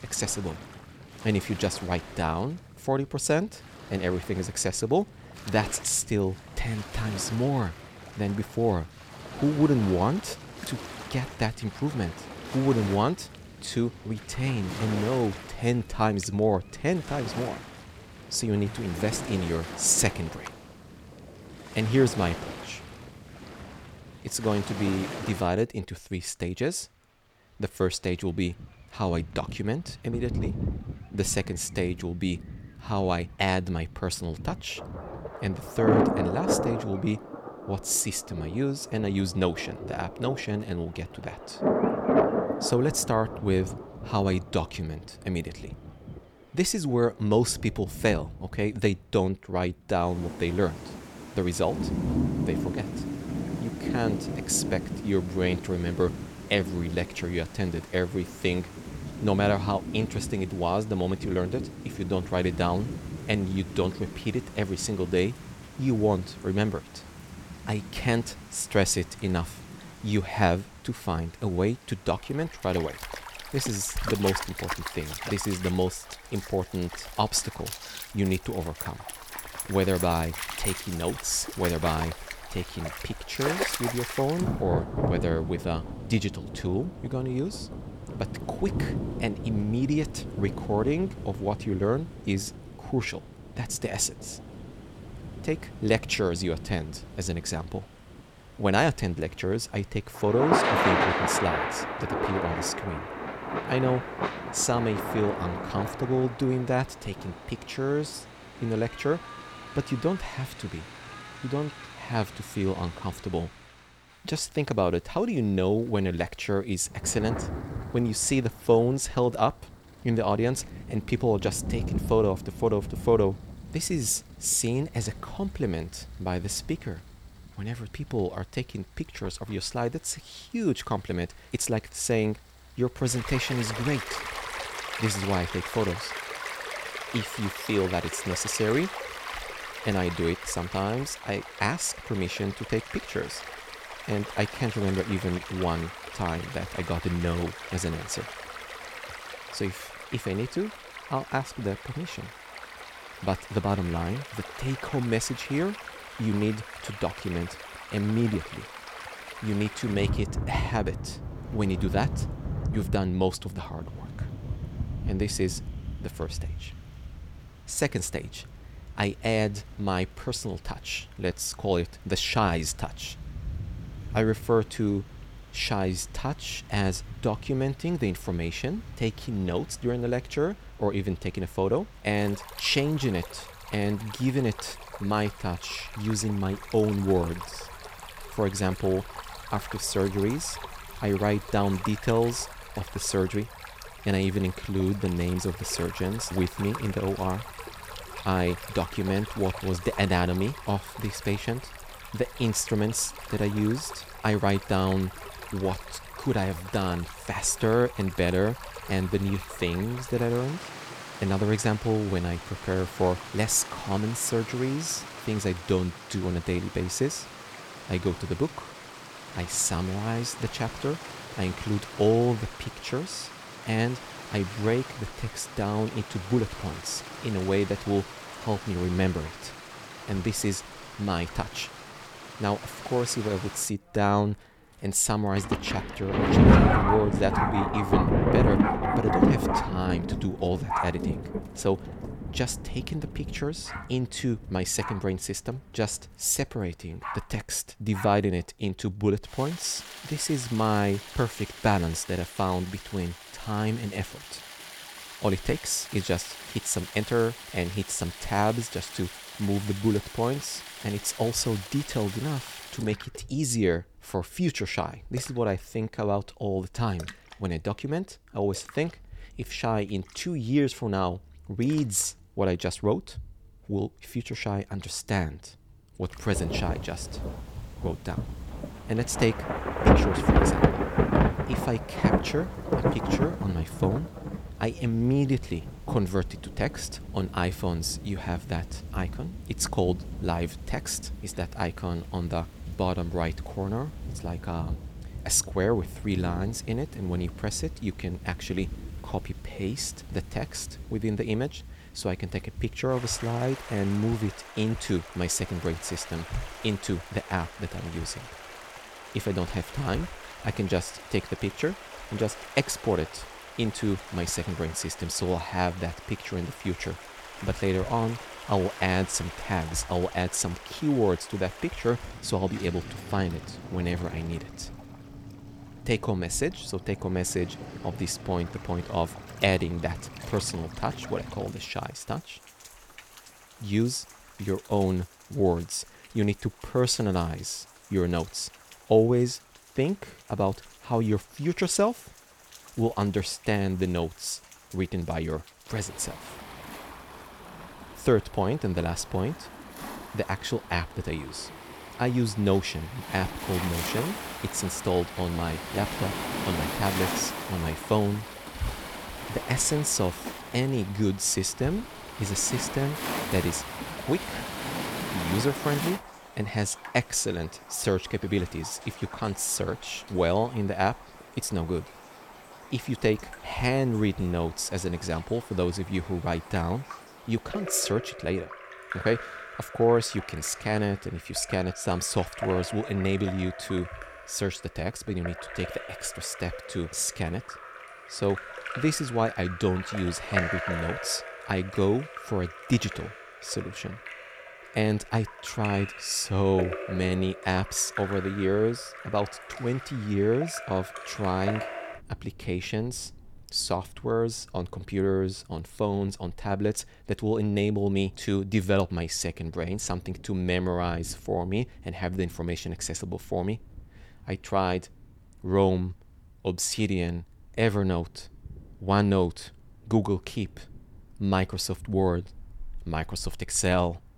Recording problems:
rain or running water; loud; throughout; 6 dB below the speech

